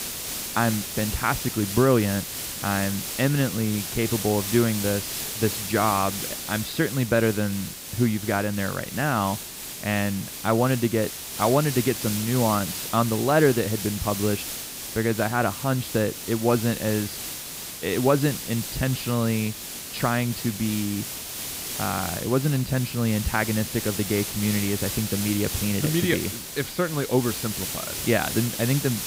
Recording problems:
high frequencies cut off; noticeable; nothing above 5 kHz
hiss; loud; throughout; 5 dB below the speech

